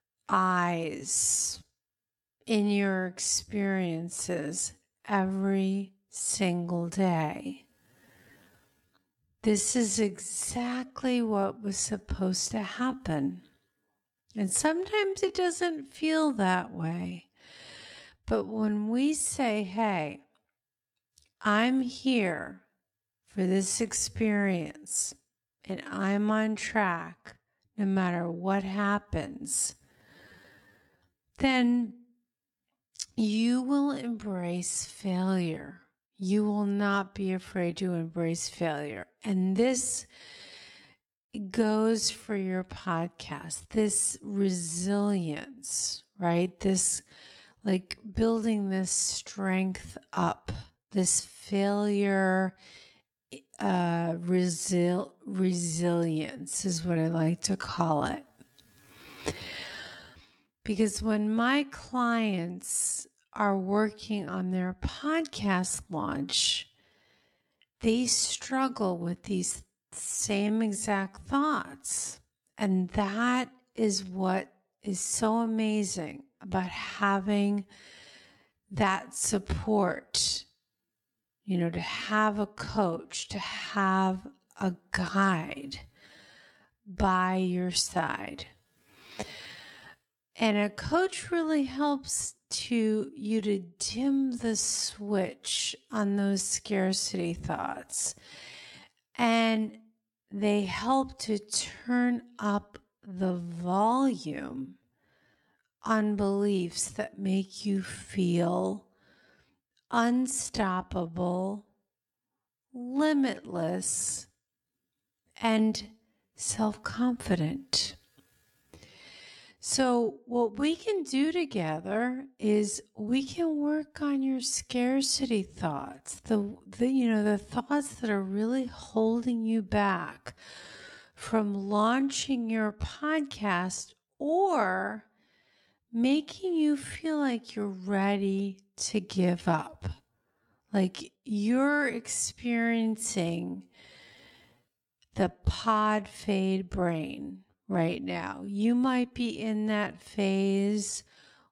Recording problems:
wrong speed, natural pitch; too slow; 0.6 times normal speed

